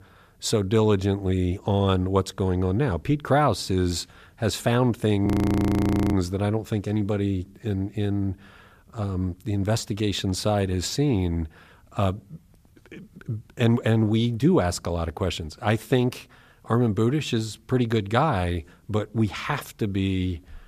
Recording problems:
audio freezing; at 5.5 s for 1 s

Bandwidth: 14.5 kHz